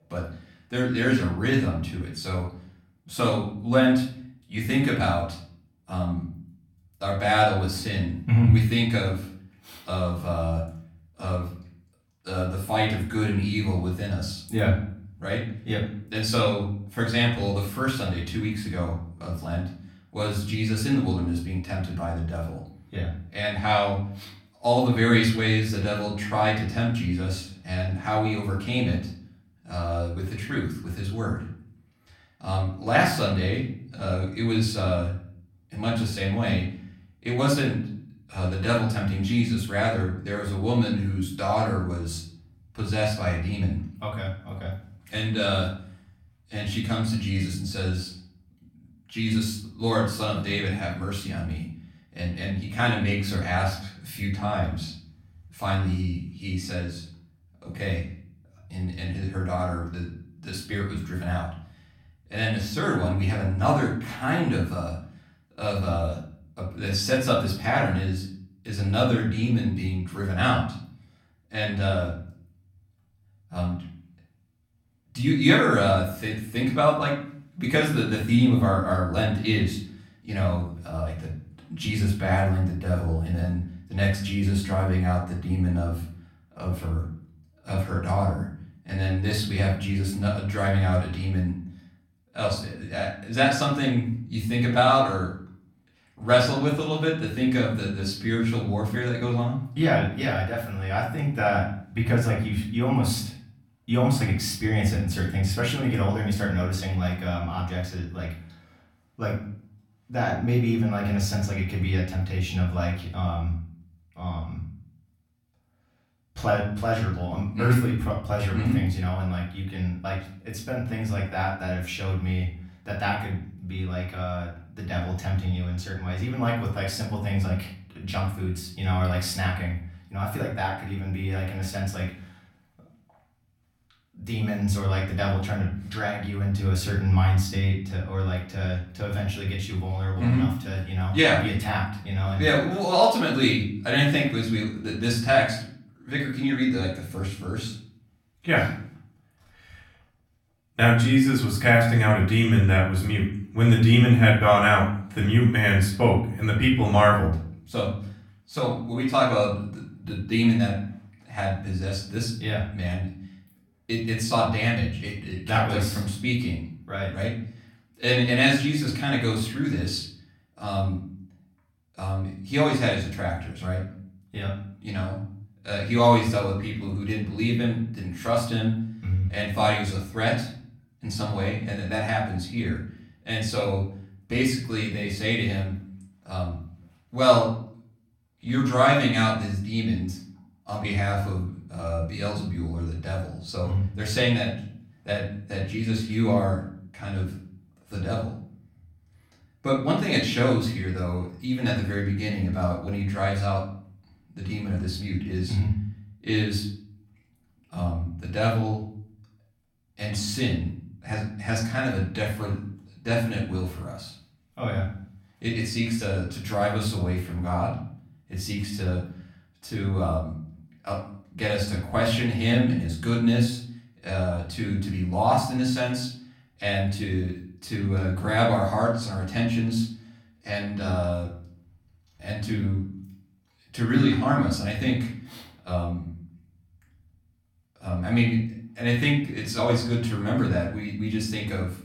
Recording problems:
off-mic speech; far
room echo; slight; dies away in 0.5 s

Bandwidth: 17.5 kHz